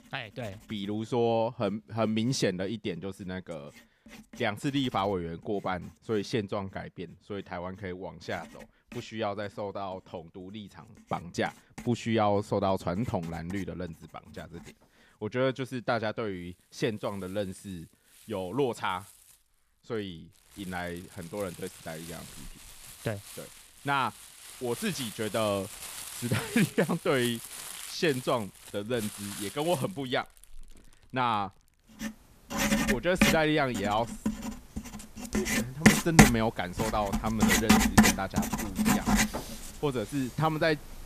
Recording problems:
household noises; very loud; throughout; 3 dB above the speech

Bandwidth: 14.5 kHz